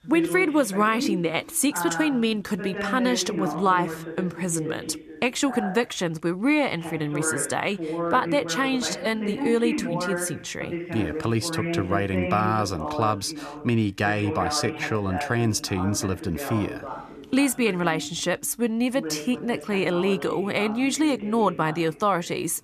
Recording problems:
voice in the background; loud; throughout; 8 dB below the speech

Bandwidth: 14.5 kHz